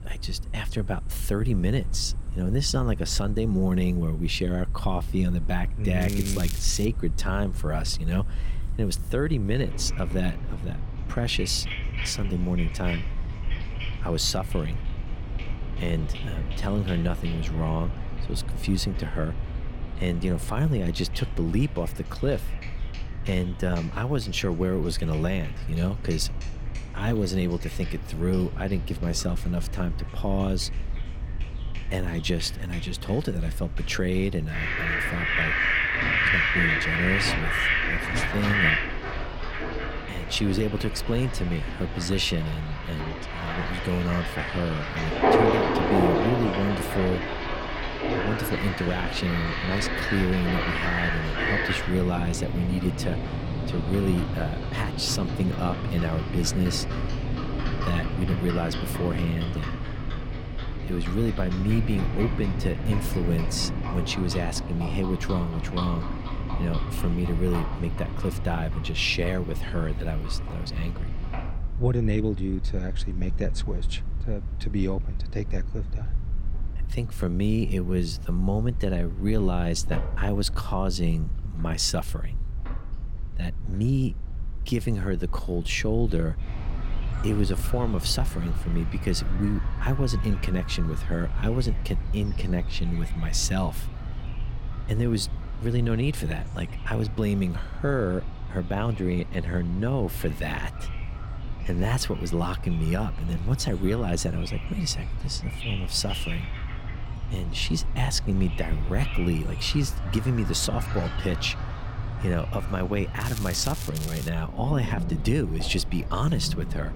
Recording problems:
animal sounds; loud; throughout; 3 dB below the speech
crackling; loud; at 6 s, at 1:53 and at 1:54; 10 dB below the speech
low rumble; faint; throughout; 20 dB below the speech

